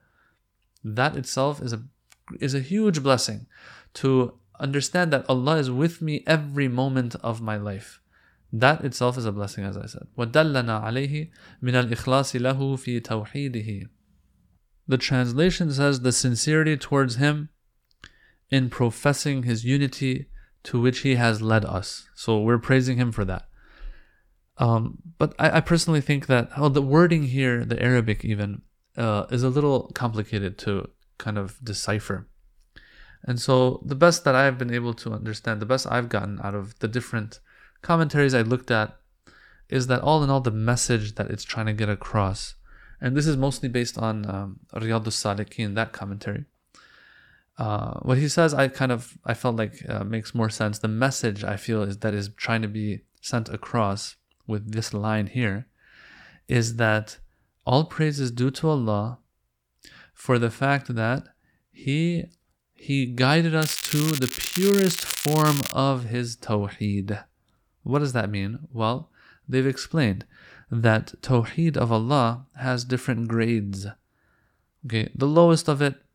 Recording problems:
crackling; loud; from 1:04 to 1:06; 5 dB below the speech

